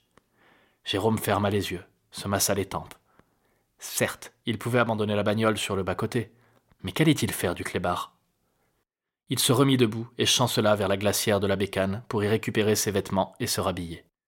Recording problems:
none

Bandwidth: 16.5 kHz